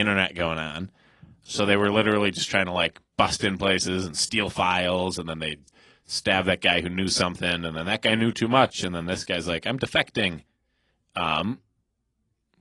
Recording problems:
garbled, watery; slightly; nothing above 10.5 kHz
abrupt cut into speech; at the start

